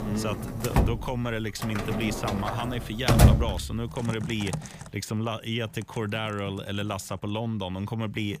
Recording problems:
household noises; very loud; throughout; 4 dB above the speech

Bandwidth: 15 kHz